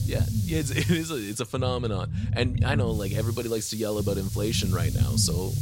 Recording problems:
hiss; noticeable; until 1.5 s and from 3 s on; 10 dB below the speech
low rumble; noticeable; throughout; 10 dB below the speech

